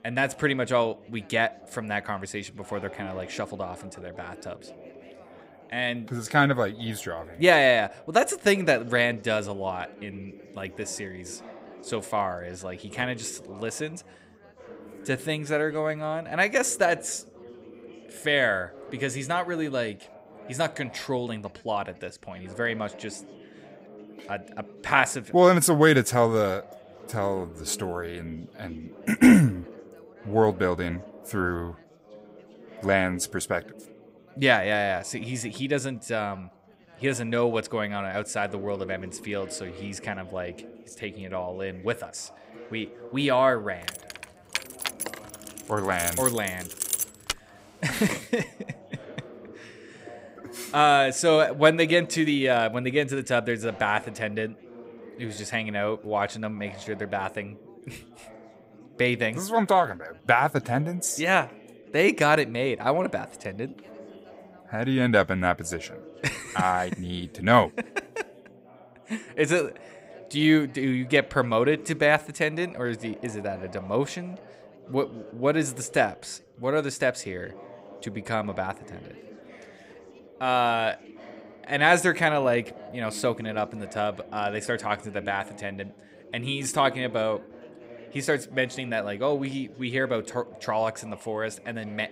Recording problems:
background chatter; faint; throughout; 4 voices, 20 dB below the speech
jangling keys; loud; from 44 to 47 s; peak level with the speech

